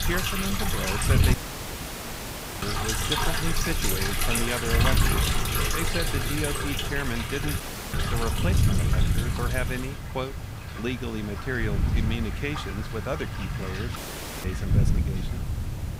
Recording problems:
rain or running water; very loud; throughout; 3 dB above the speech
wind noise on the microphone; heavy; 9 dB below the speech
hiss; noticeable; throughout; 10 dB below the speech
audio cutting out; at 1.5 s for 1.5 s, at 7.5 s and at 14 s

